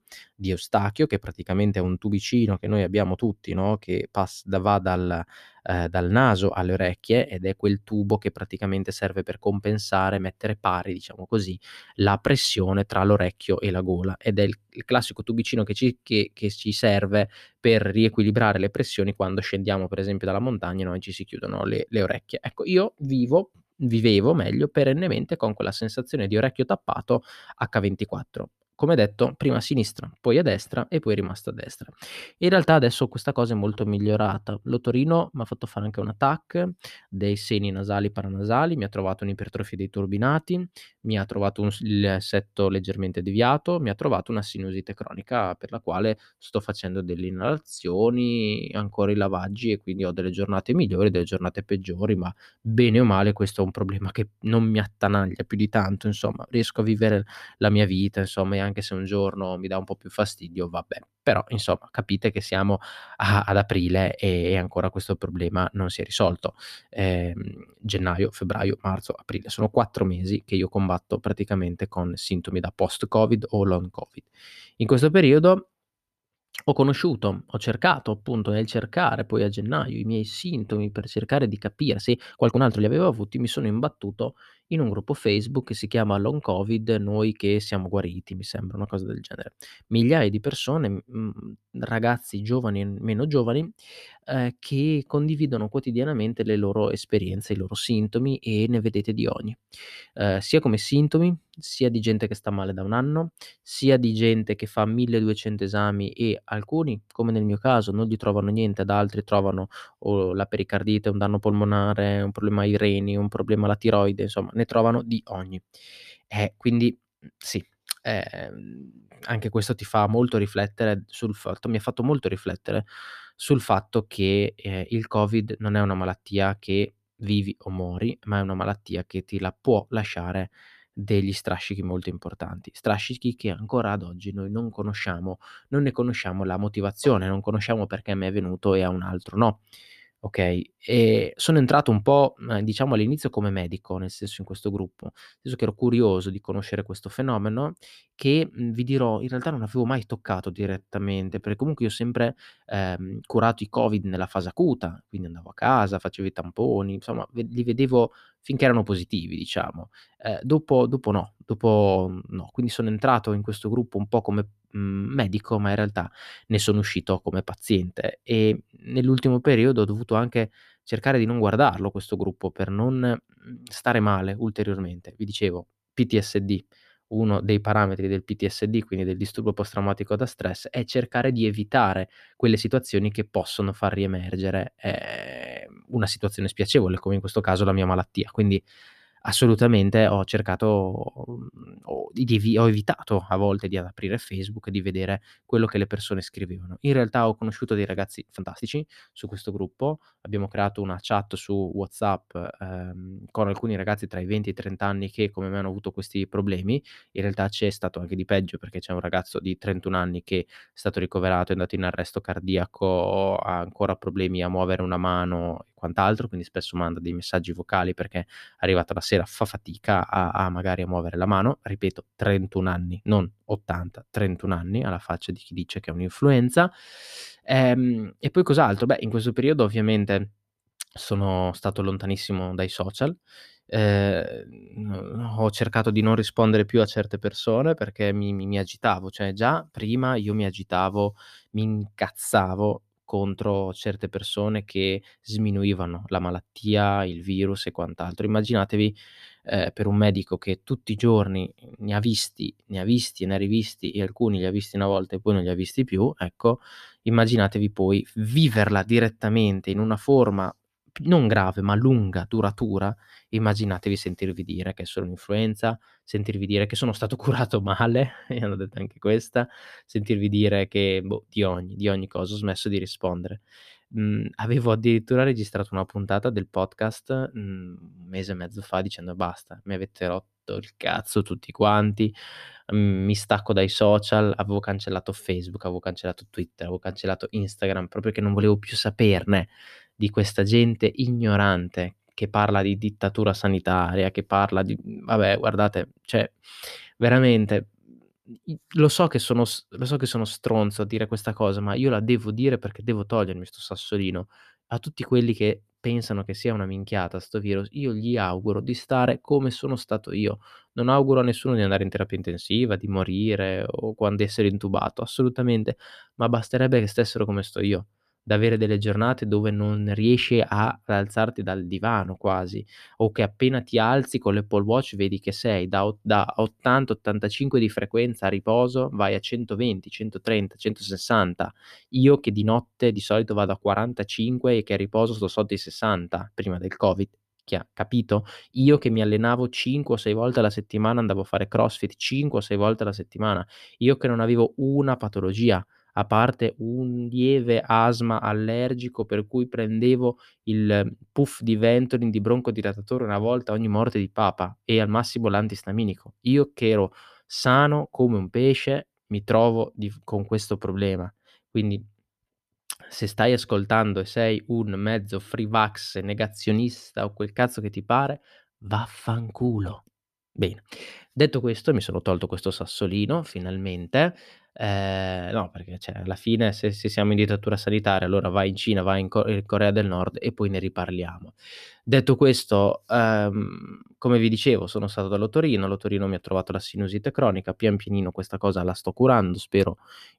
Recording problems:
uneven, jittery; strongly; from 34 s to 3:23

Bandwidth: 14.5 kHz